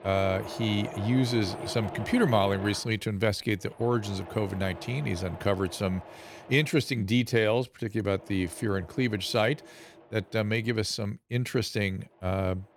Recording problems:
machinery noise; noticeable; throughout; 15 dB below the speech

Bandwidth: 17.5 kHz